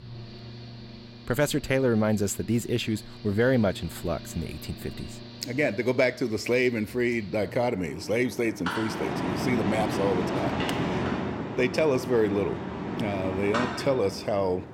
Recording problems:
machinery noise; loud; throughout; 6 dB below the speech

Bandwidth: 16 kHz